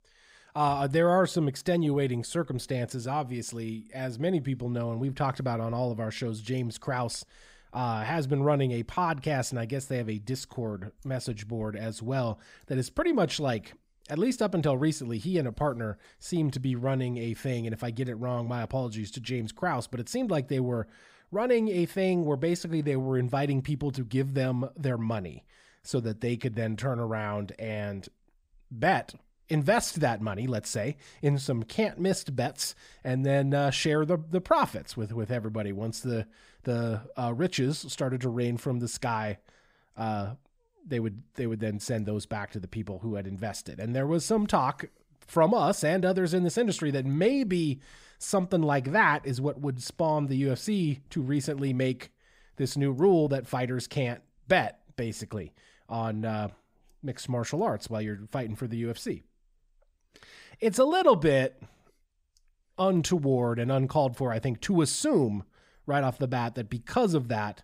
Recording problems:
none

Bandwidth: 15.5 kHz